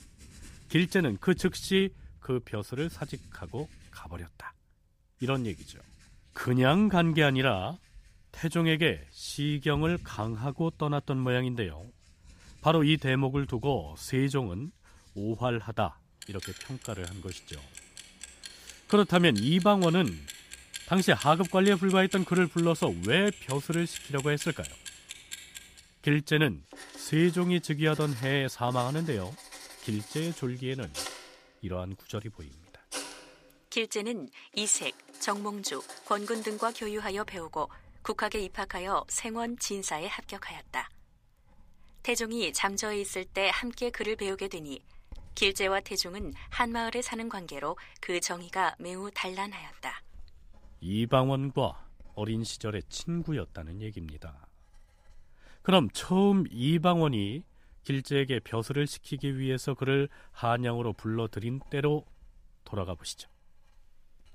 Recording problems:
household noises; noticeable; throughout; 15 dB below the speech

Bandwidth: 15 kHz